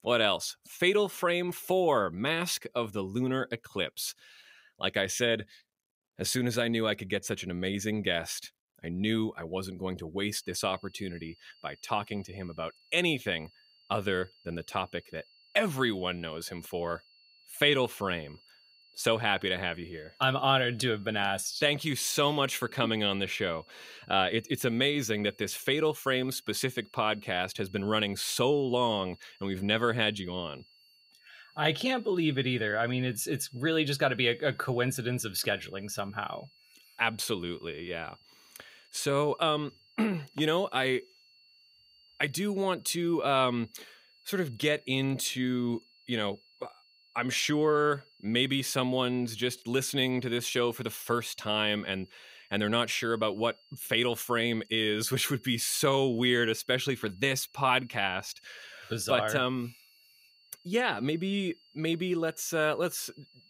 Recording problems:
high-pitched whine; faint; from 10 s on; 4.5 kHz, 30 dB below the speech

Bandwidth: 15.5 kHz